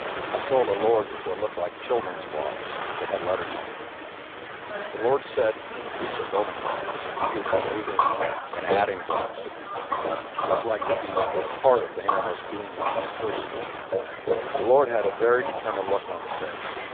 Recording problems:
phone-call audio; poor line
wind noise on the microphone; heavy; 8 dB below the speech
rain or running water; loud; throughout; 4 dB below the speech
voice in the background; noticeable; throughout; 15 dB below the speech

